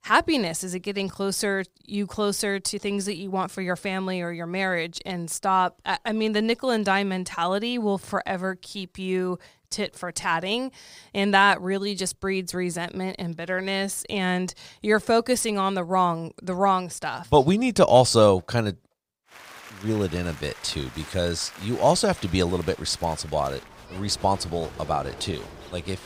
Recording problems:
crowd noise; noticeable; from 19 s on; 20 dB below the speech

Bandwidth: 15.5 kHz